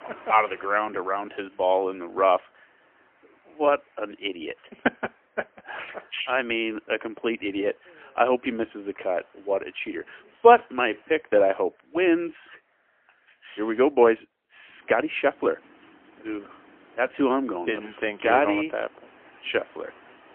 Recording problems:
phone-call audio; poor line; nothing above 3 kHz
traffic noise; faint; throughout; 30 dB below the speech

